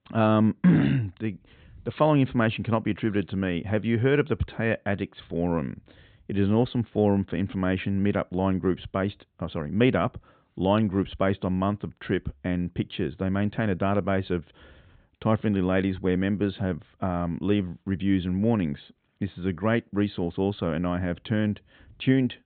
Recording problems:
high frequencies cut off; severe; nothing above 4 kHz

